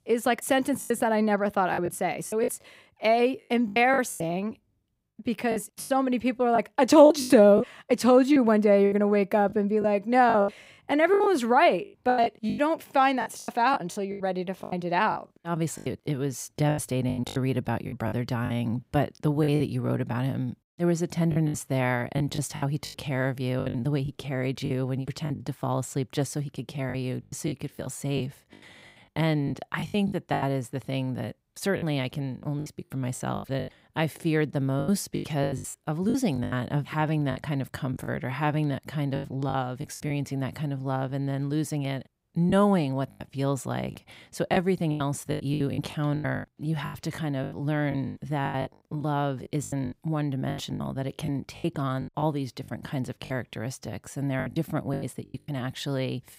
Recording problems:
choppy; very; 12% of the speech affected

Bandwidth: 15.5 kHz